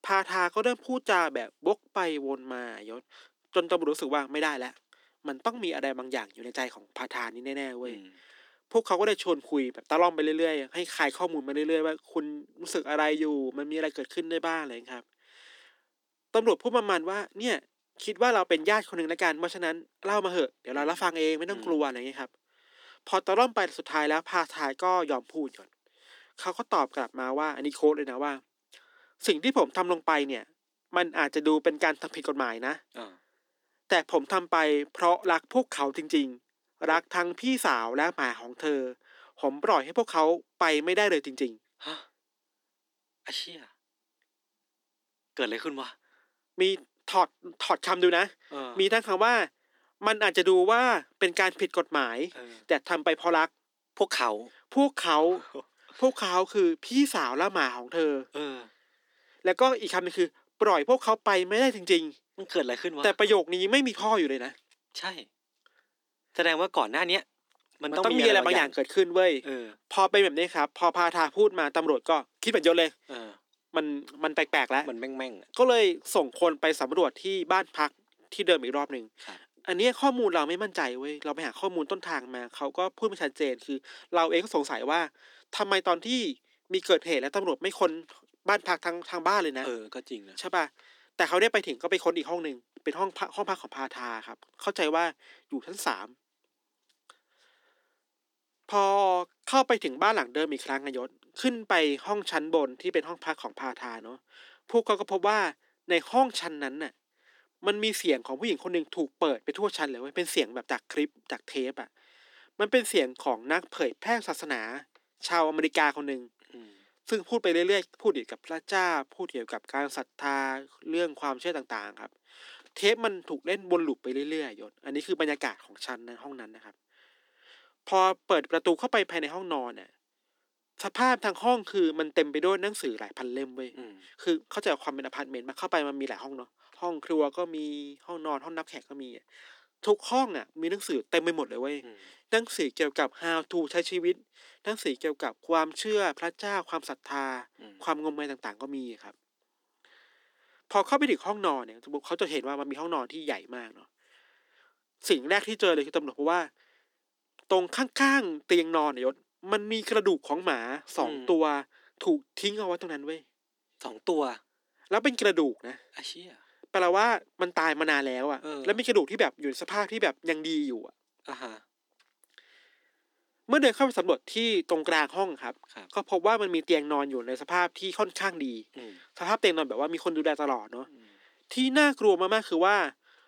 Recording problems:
thin; somewhat; fading below 250 Hz

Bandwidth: 18.5 kHz